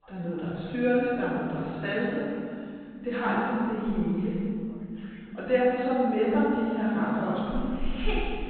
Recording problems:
room echo; strong; dies away in 2.3 s
off-mic speech; far
high frequencies cut off; severe; nothing above 4 kHz
background chatter; faint; throughout; 4 voices, 25 dB below the speech

